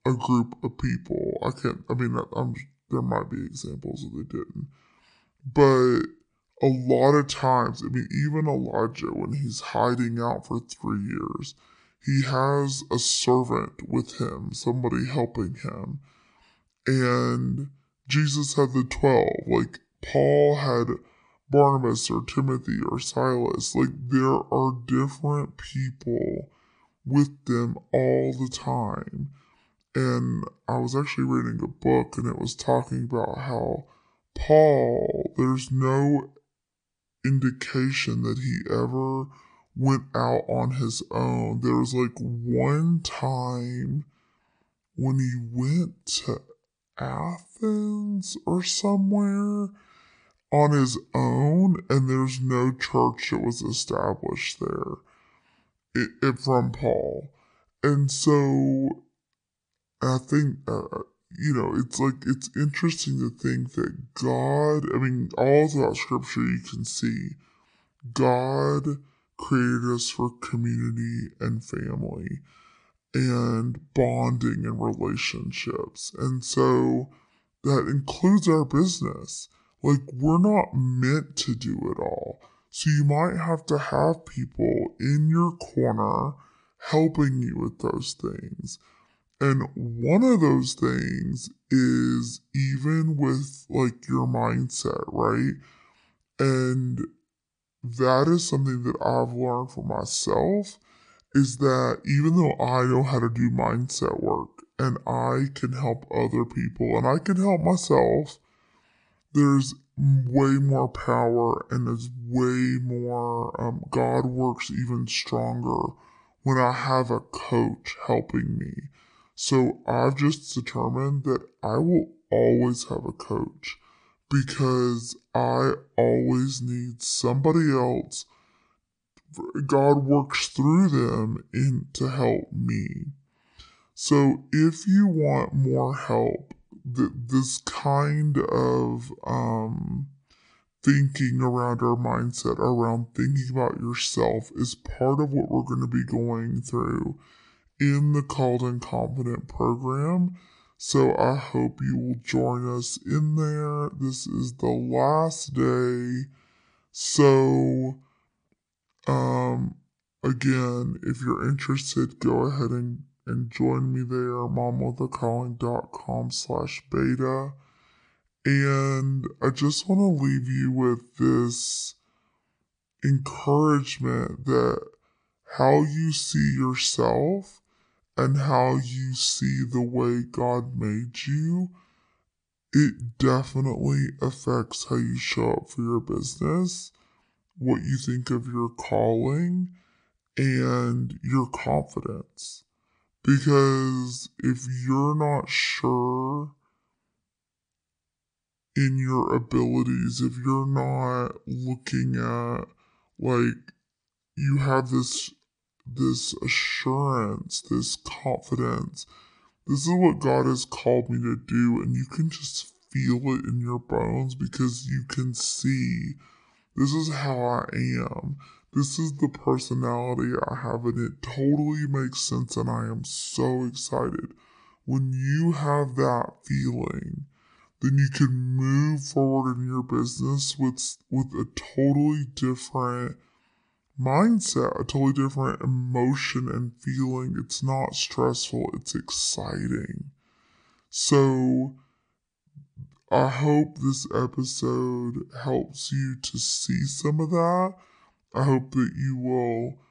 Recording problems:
wrong speed and pitch; too slow and too low; 0.6 times normal speed

